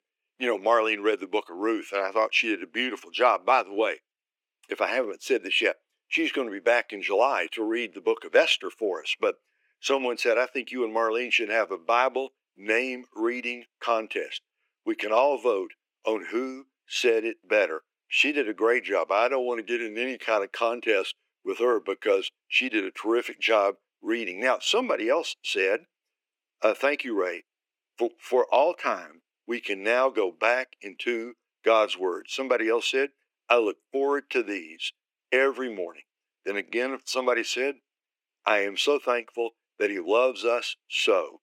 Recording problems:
thin; very; fading below 300 Hz

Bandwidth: 17 kHz